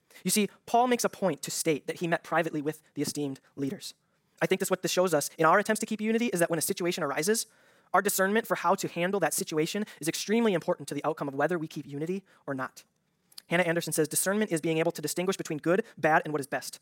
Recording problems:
wrong speed, natural pitch; too fast; 1.7 times normal speed

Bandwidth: 16.5 kHz